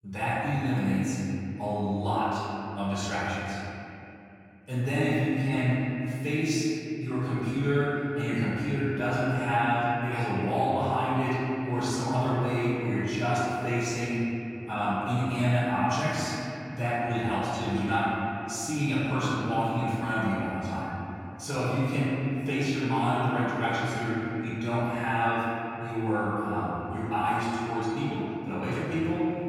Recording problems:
room echo; strong; dies away in 2.9 s
off-mic speech; far

